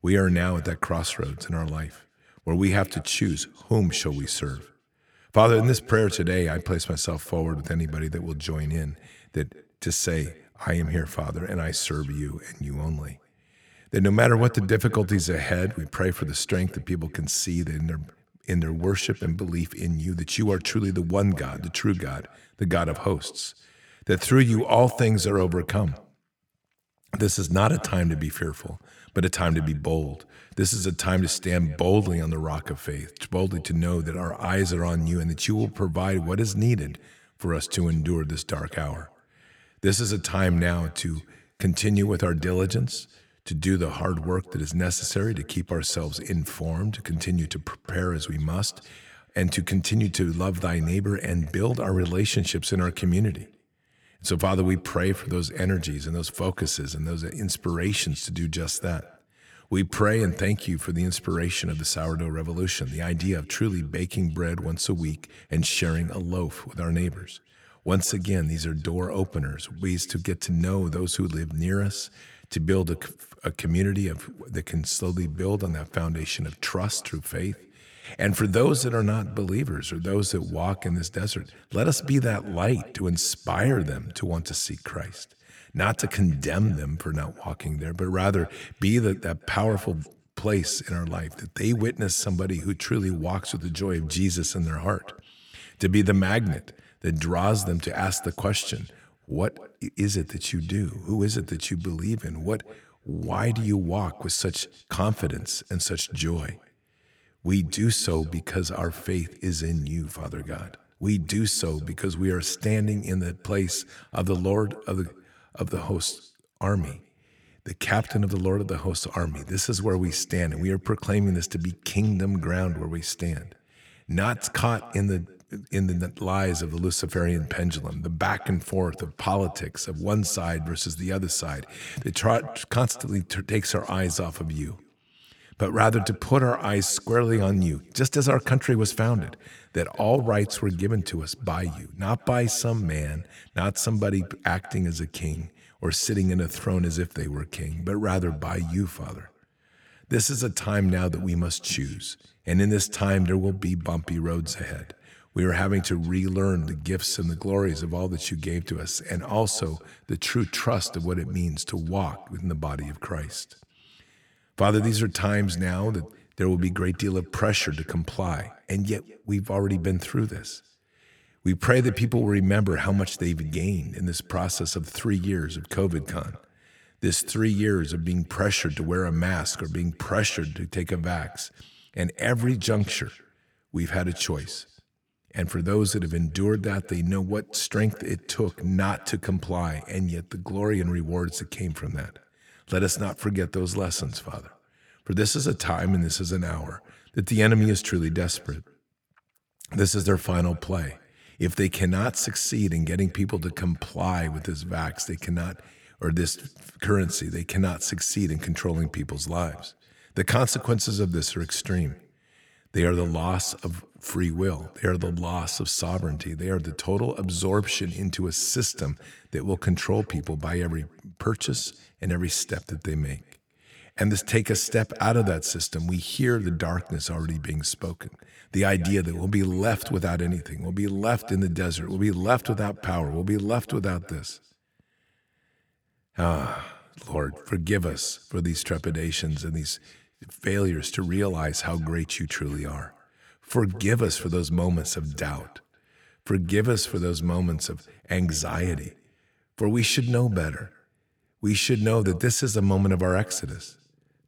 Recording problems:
echo of what is said; faint; throughout; 180 ms later, 25 dB below the speech

